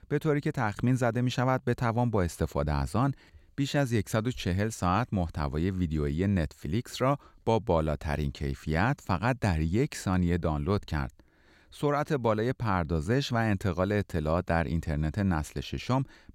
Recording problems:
none

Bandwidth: 16 kHz